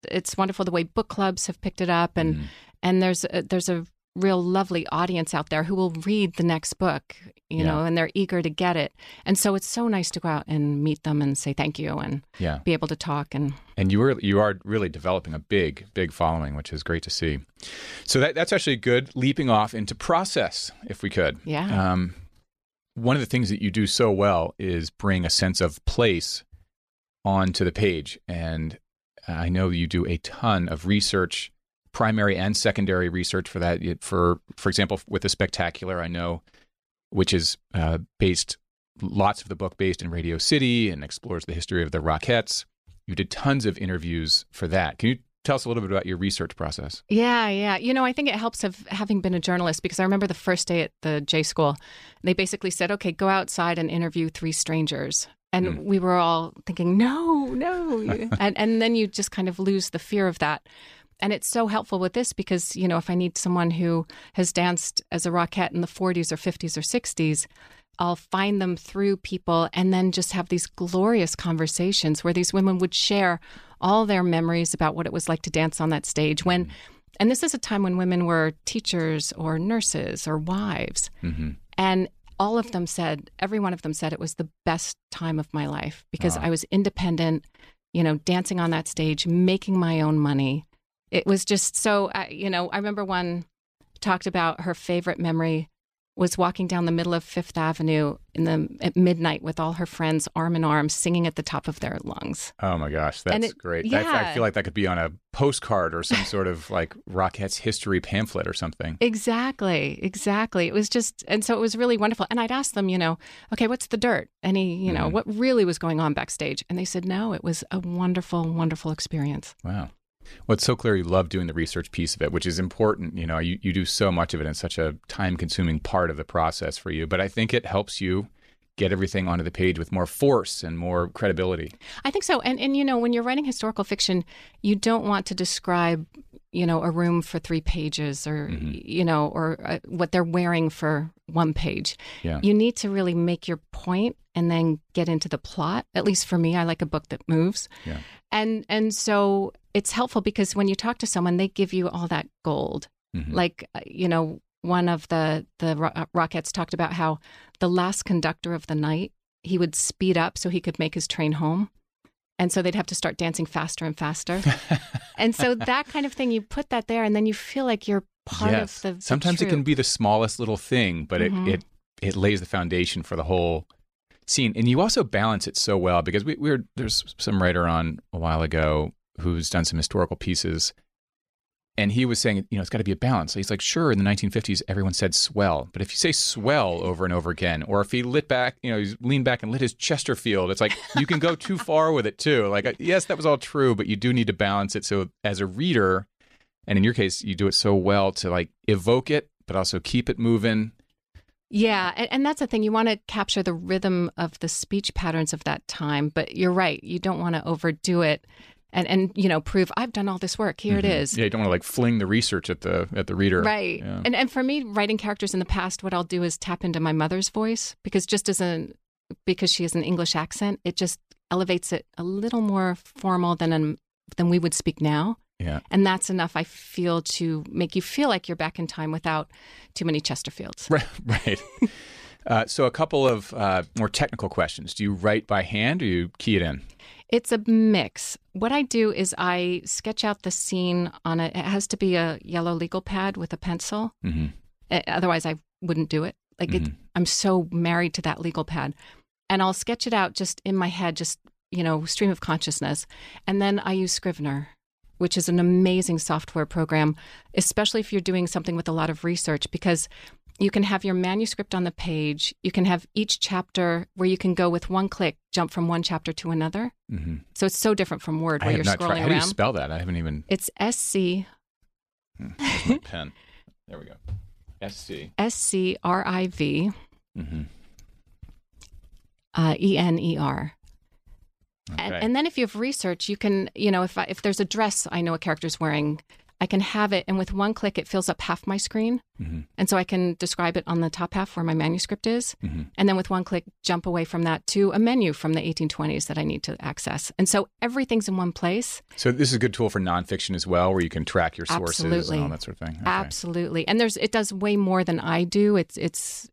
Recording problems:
none

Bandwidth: 14.5 kHz